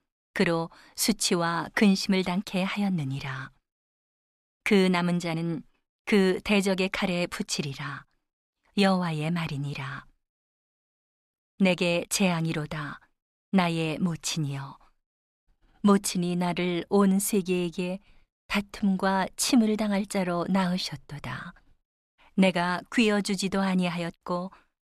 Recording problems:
none

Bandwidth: 13.5 kHz